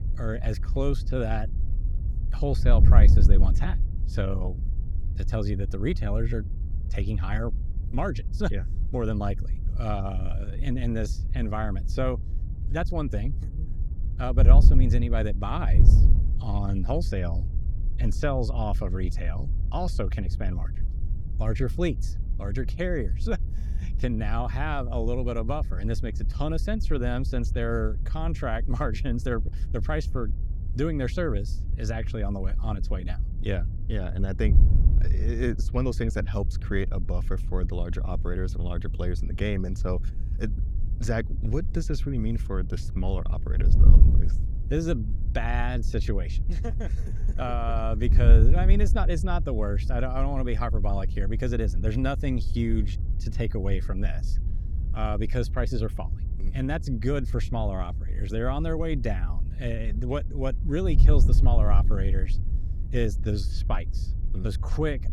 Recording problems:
wind noise on the microphone; occasional gusts; 10 dB below the speech

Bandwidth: 17.5 kHz